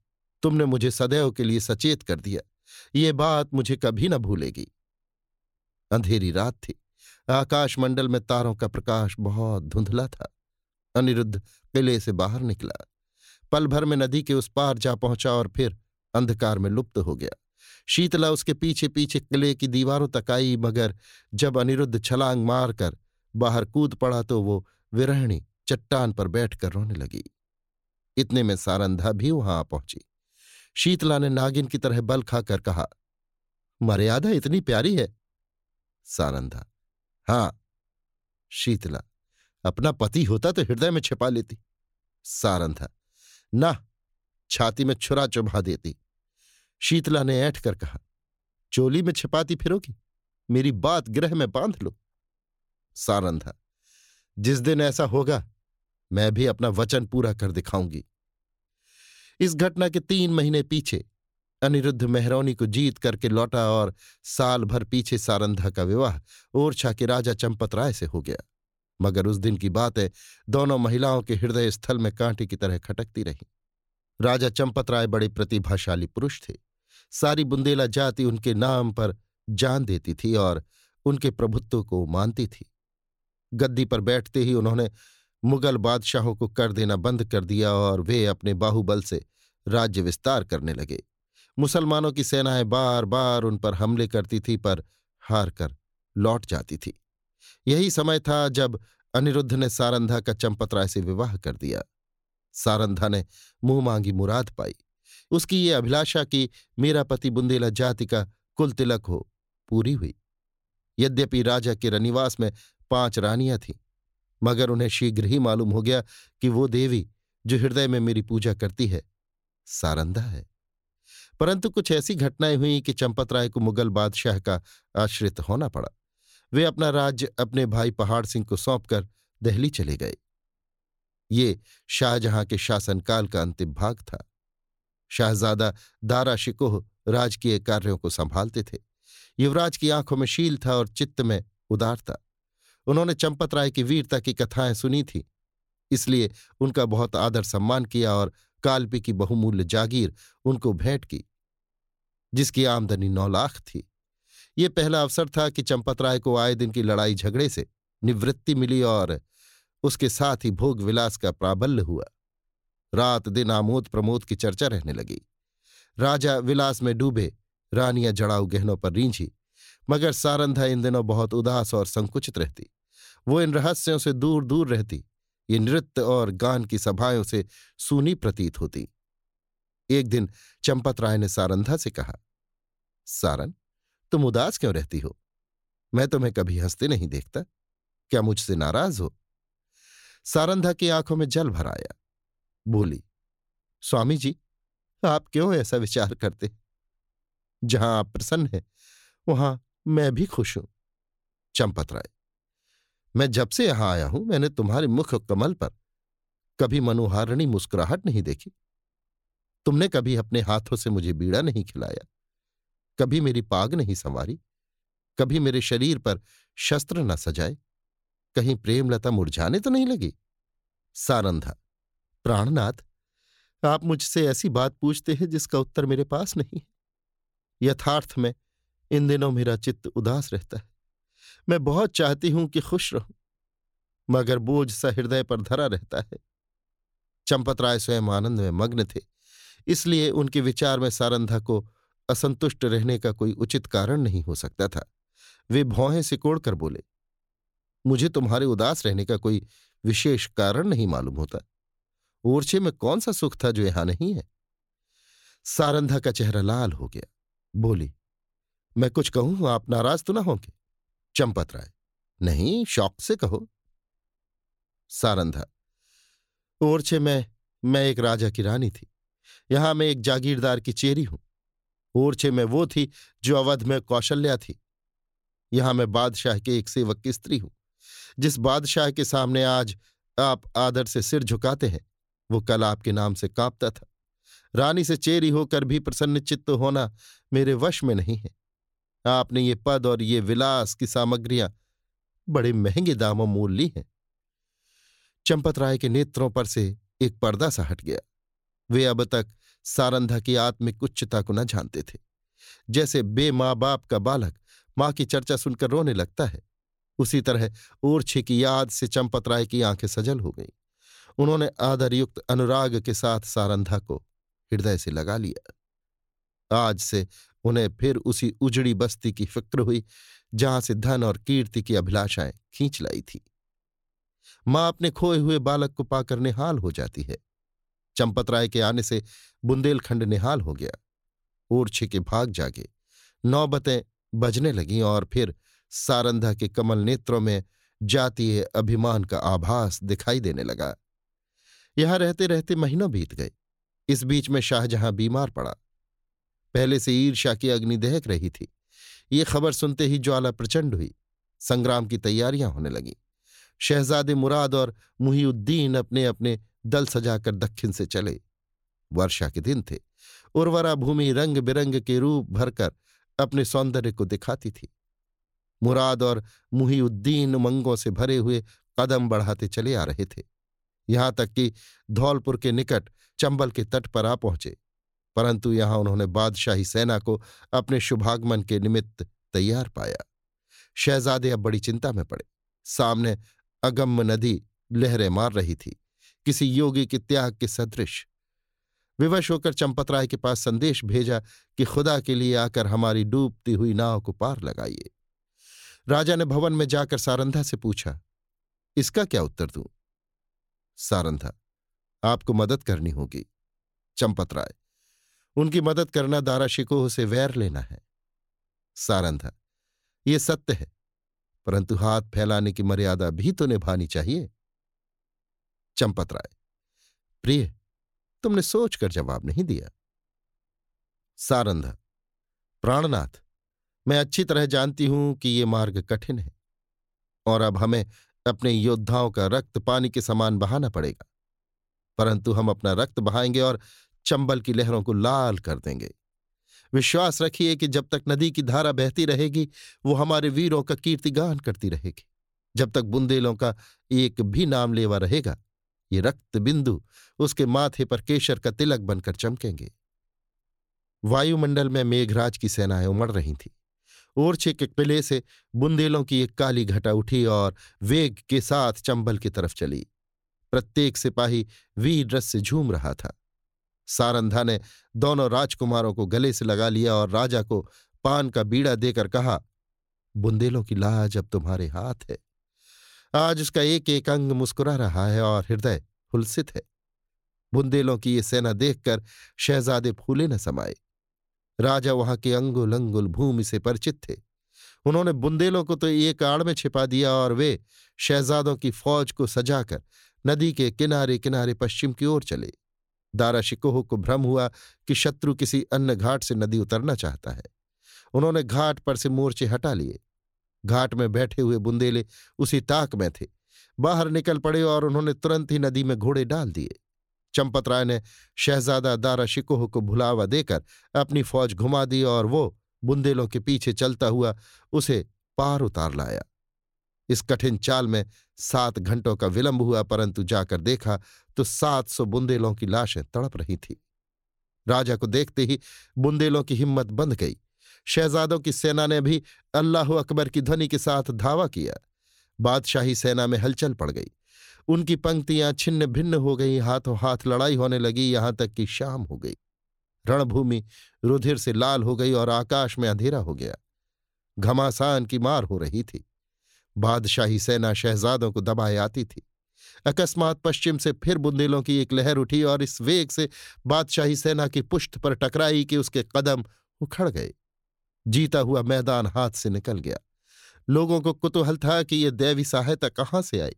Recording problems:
none

